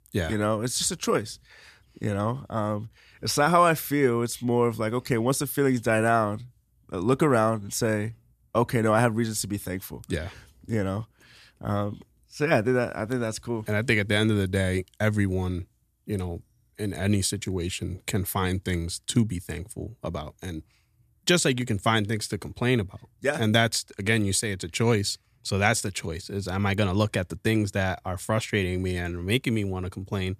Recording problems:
none

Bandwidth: 14.5 kHz